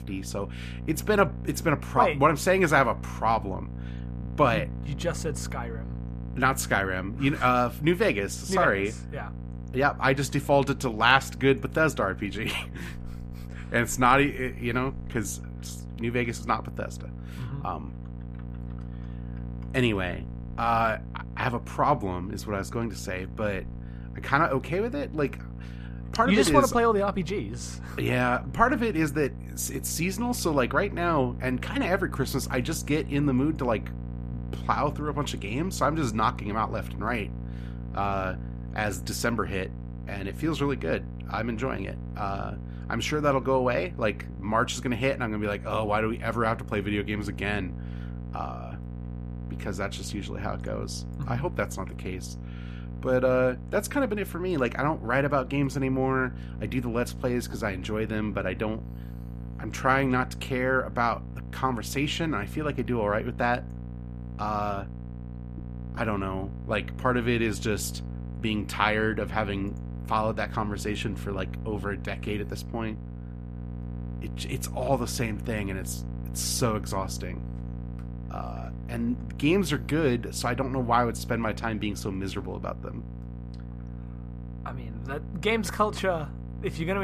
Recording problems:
electrical hum; faint; throughout; 60 Hz, 20 dB below the speech
abrupt cut into speech; at the end

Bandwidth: 14.5 kHz